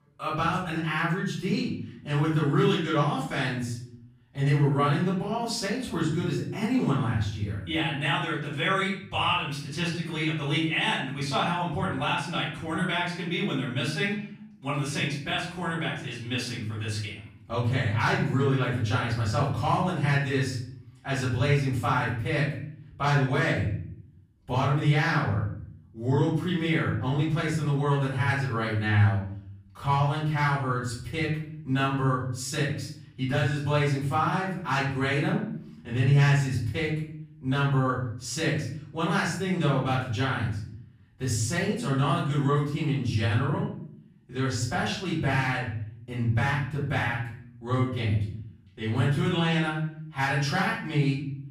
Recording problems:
off-mic speech; far
room echo; noticeable; dies away in 0.6 s

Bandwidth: 15 kHz